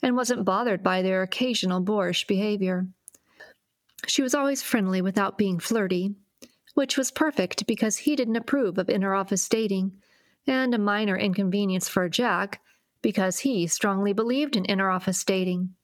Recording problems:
squashed, flat; somewhat

